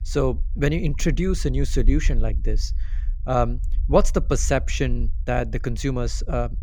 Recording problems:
low rumble; faint; throughout; 25 dB below the speech

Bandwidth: 18 kHz